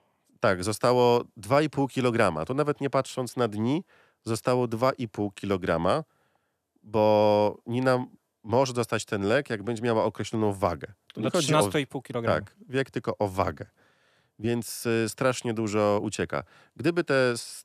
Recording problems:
none

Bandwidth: 14.5 kHz